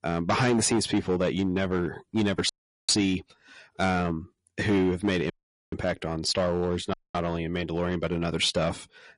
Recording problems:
distortion; slight; 6% of the sound clipped
garbled, watery; slightly; nothing above 10.5 kHz
audio cutting out; at 2.5 s, at 5.5 s and at 7 s

